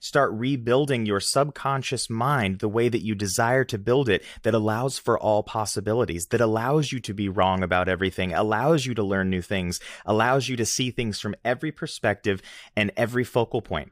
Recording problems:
none

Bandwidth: 15 kHz